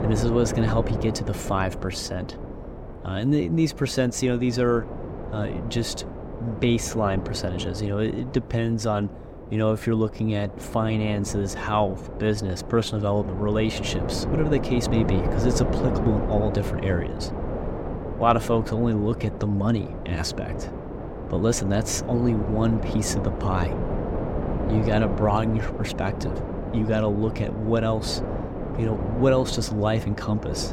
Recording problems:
wind noise on the microphone; heavy; 7 dB below the speech

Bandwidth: 16 kHz